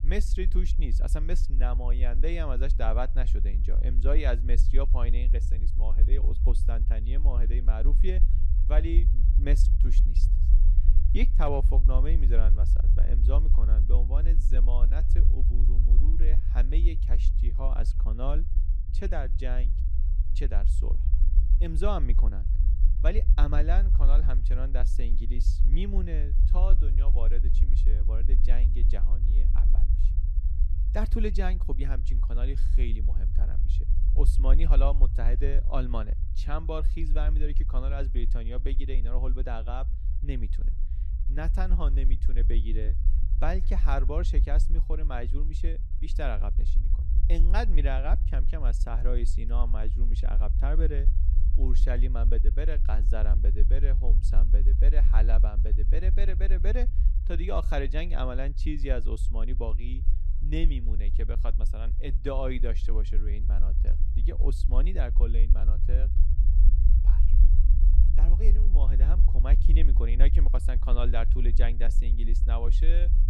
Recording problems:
low rumble; noticeable; throughout; 10 dB below the speech

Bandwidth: 14 kHz